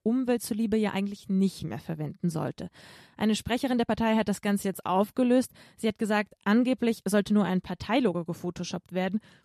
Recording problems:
uneven, jittery; strongly; from 1 to 8.5 s

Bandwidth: 13.5 kHz